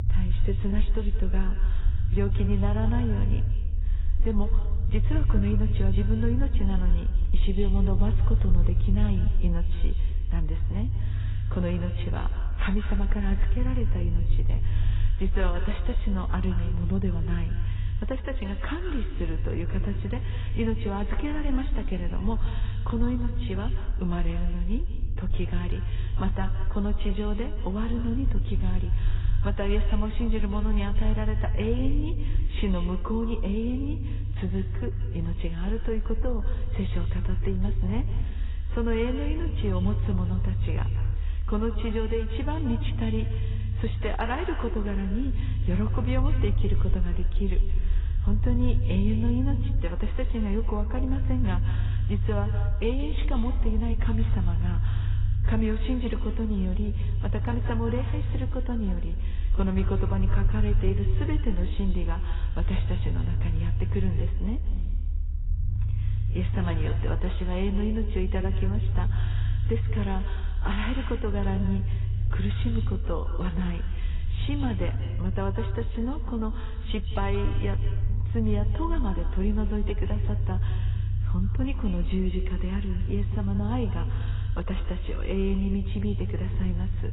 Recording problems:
garbled, watery; badly; nothing above 4 kHz
echo of what is said; noticeable; throughout; 170 ms later, 15 dB below the speech
low rumble; noticeable; throughout; 10 dB below the speech

